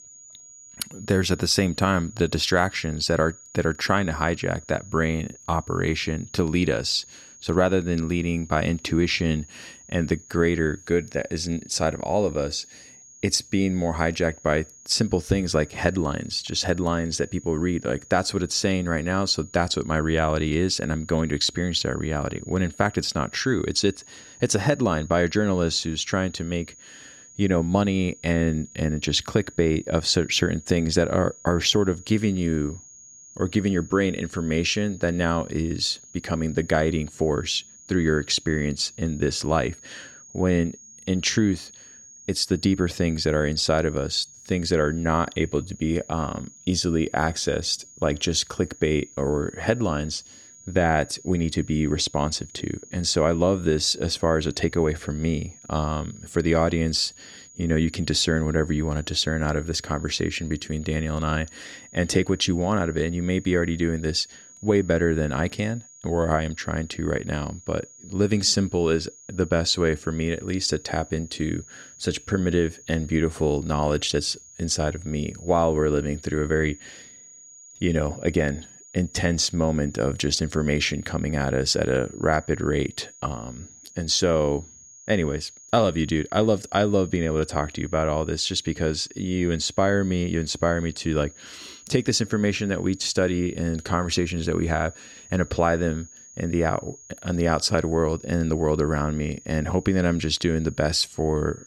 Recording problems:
high-pitched whine; faint; throughout; 6.5 kHz, 20 dB below the speech

